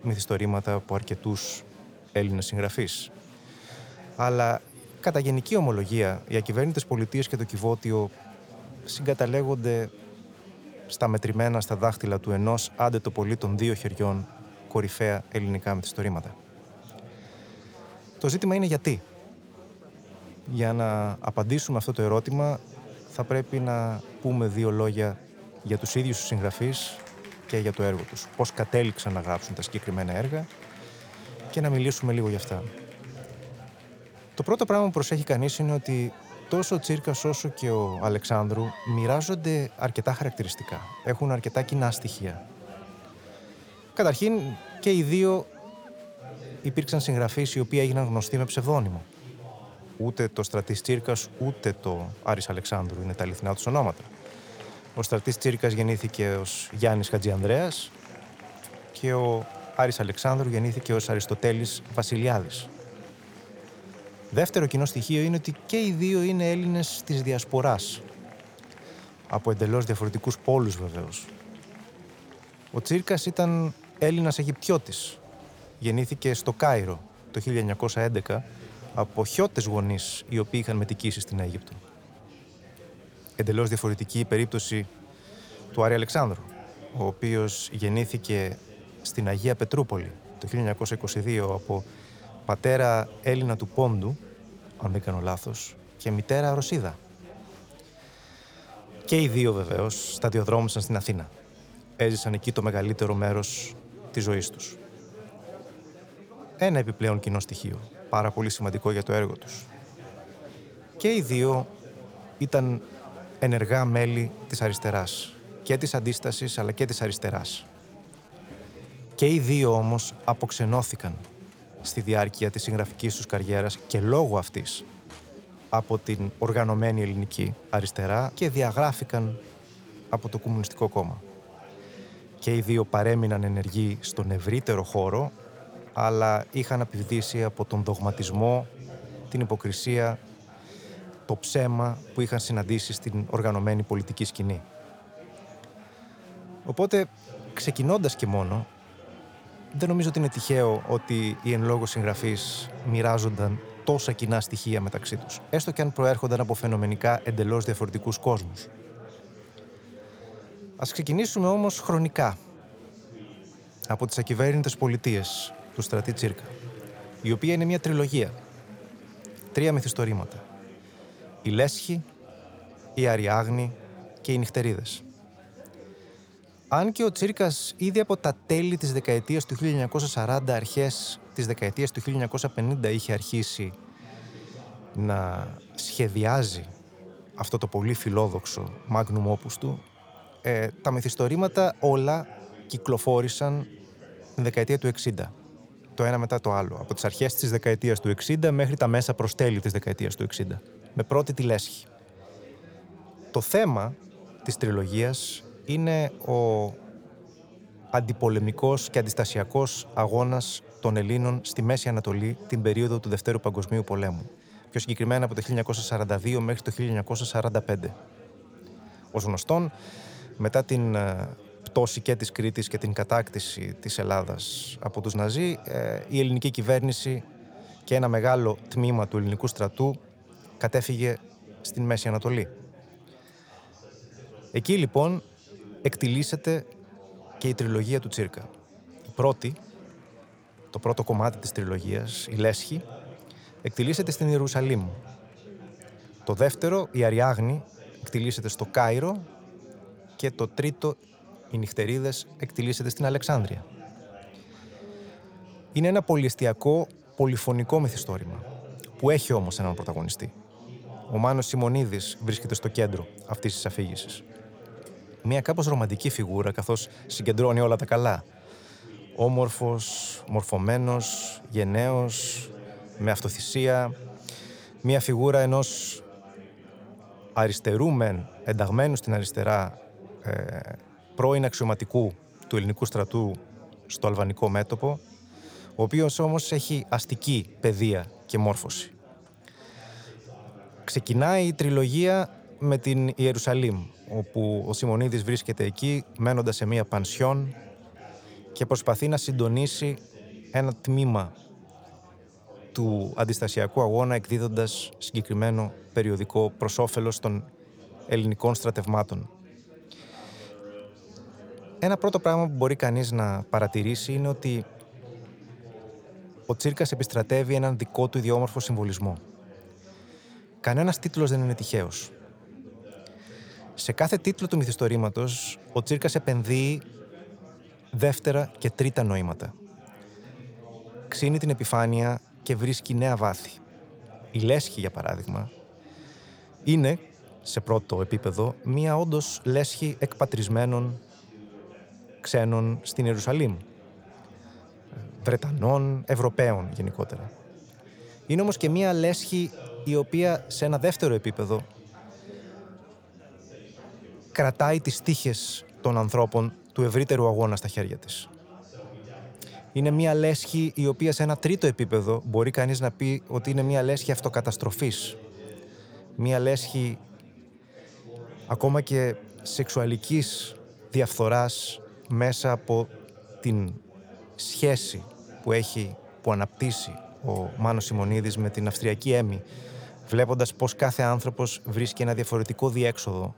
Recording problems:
chatter from many people; faint; throughout; 20 dB below the speech

